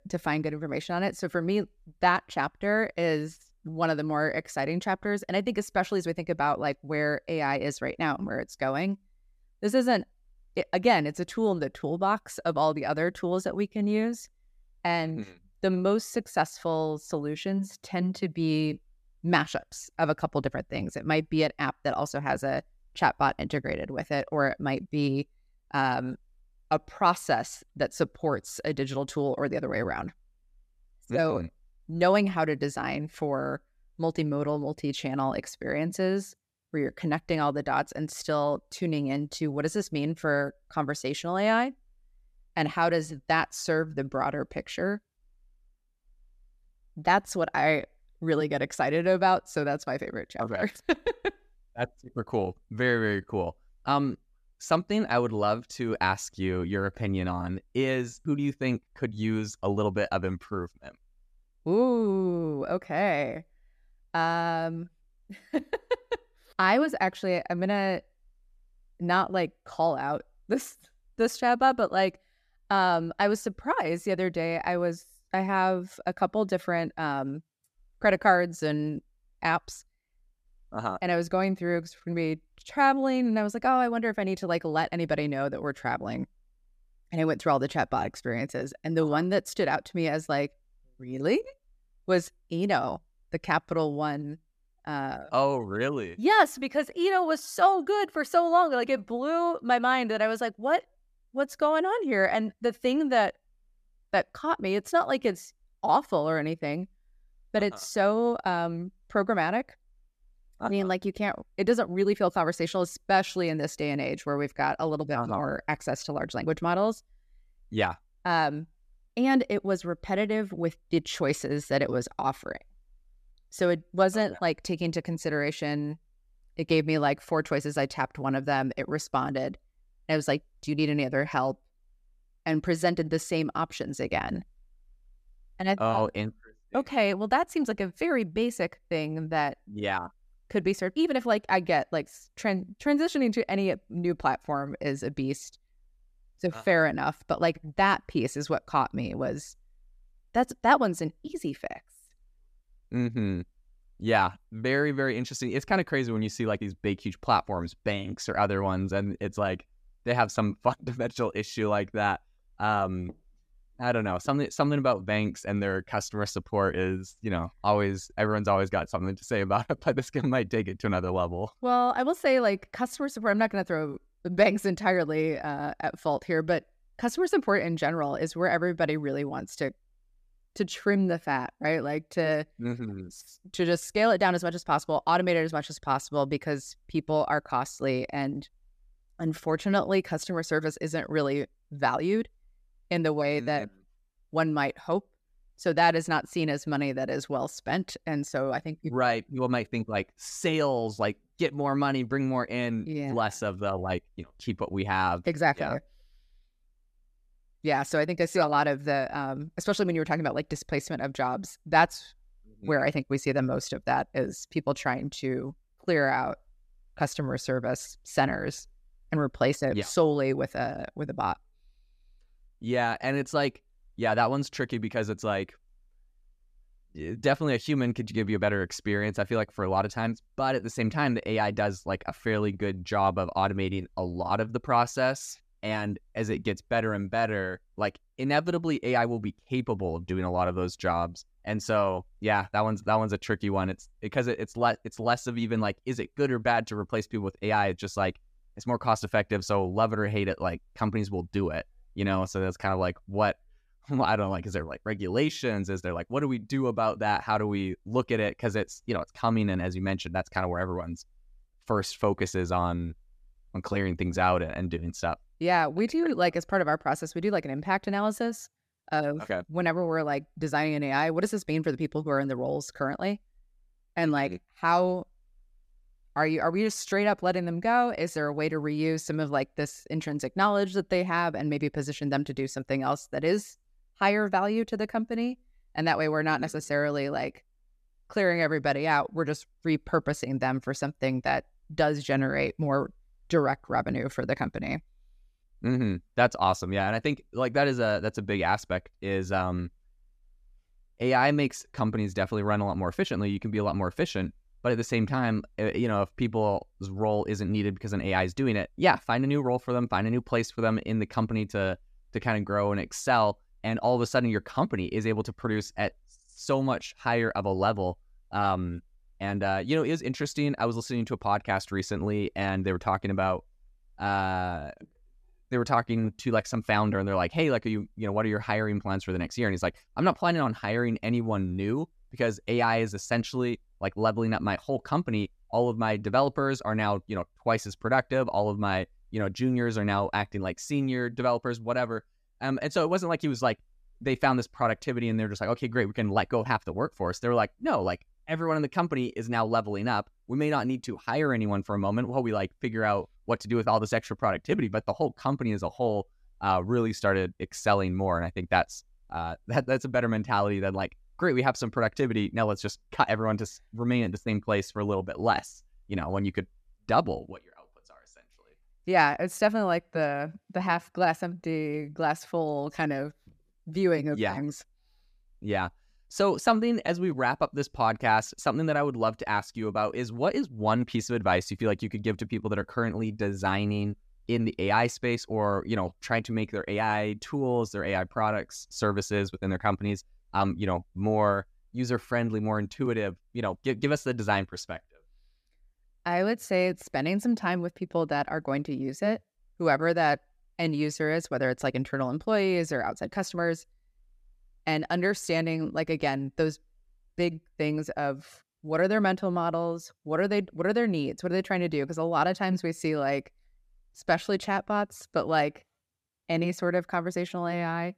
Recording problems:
none

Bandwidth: 14.5 kHz